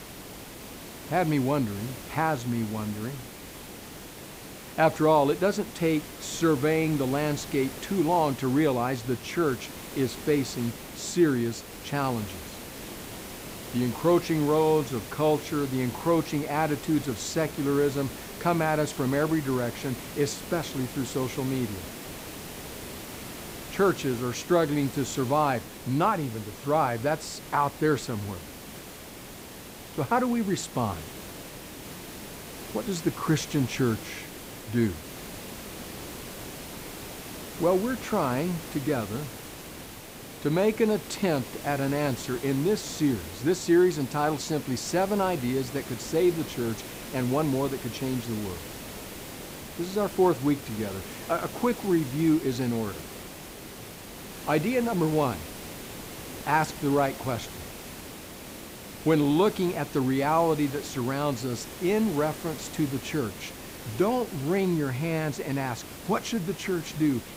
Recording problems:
hiss; noticeable; throughout; 10 dB below the speech

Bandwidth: 15.5 kHz